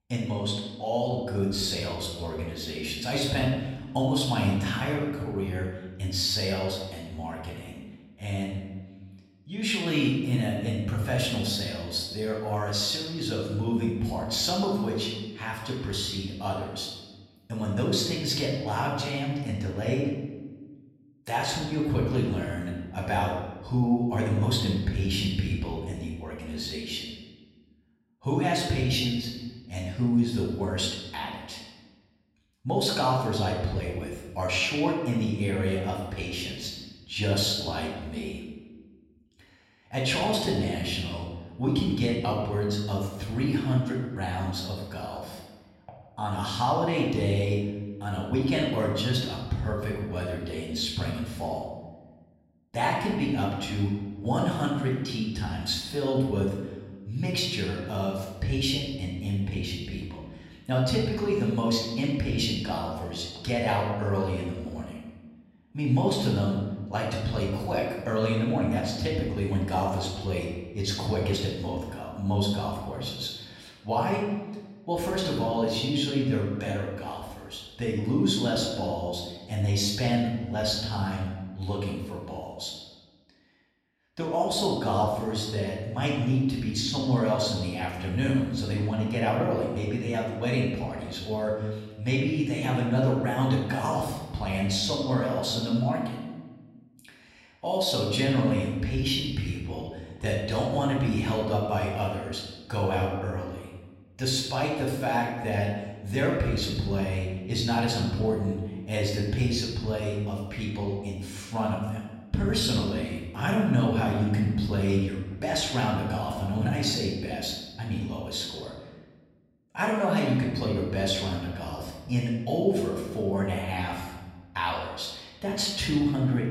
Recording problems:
off-mic speech; far
room echo; noticeable; dies away in 1.1 s

